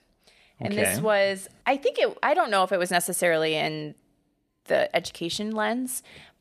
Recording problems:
none

